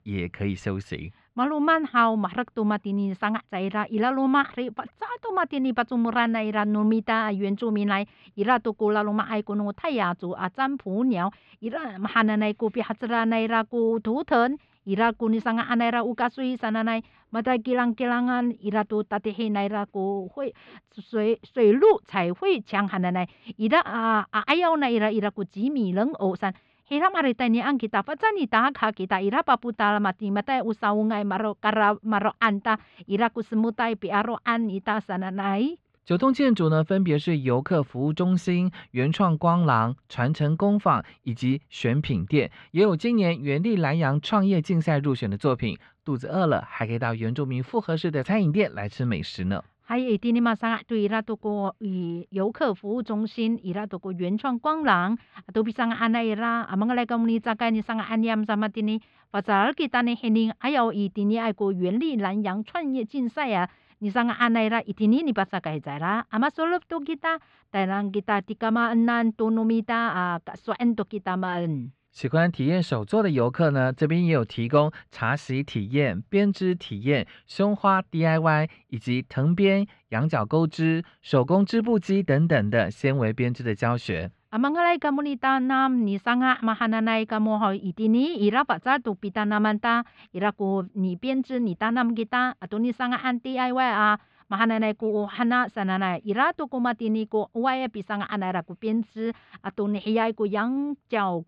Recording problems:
muffled; slightly; fading above 4 kHz

